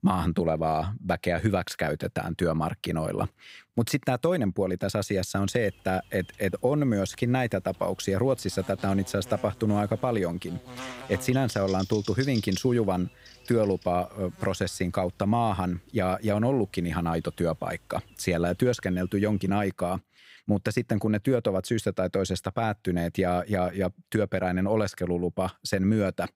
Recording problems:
electrical hum; noticeable; from 5.5 to 20 s; 50 Hz, 15 dB below the speech

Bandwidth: 15.5 kHz